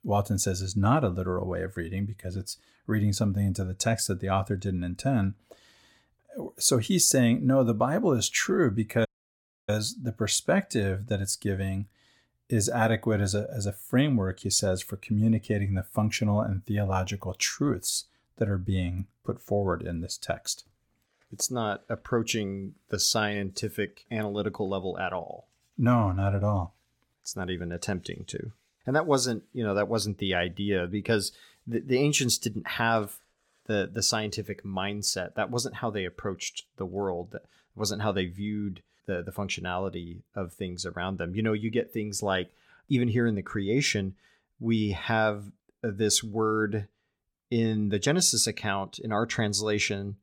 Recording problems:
audio cutting out; at 9 s for 0.5 s

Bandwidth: 17.5 kHz